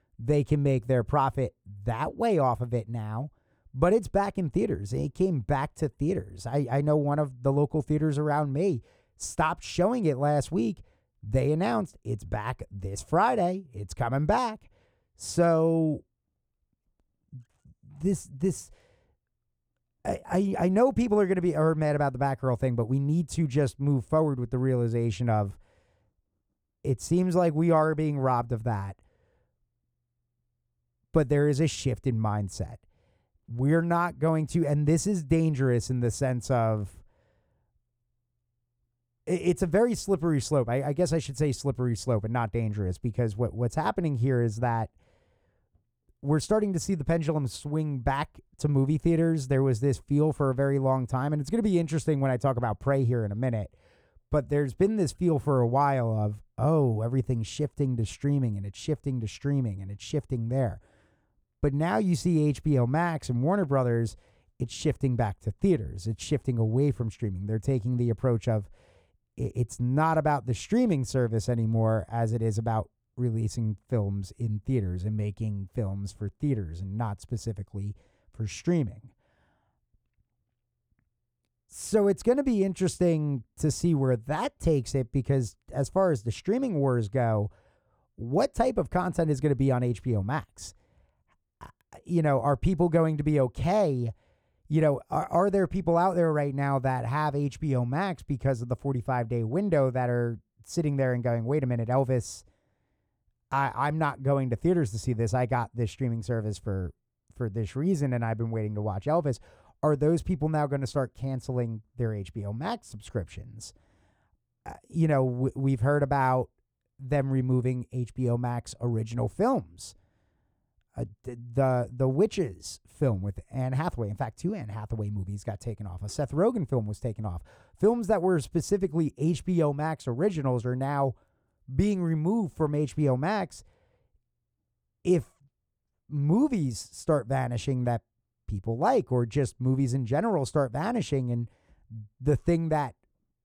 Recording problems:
muffled; slightly; fading above 1.5 kHz

